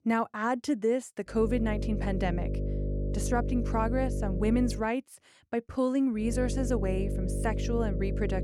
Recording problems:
electrical hum; loud; from 1.5 to 5 s and from 6 s on; 50 Hz, 9 dB below the speech

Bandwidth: 18 kHz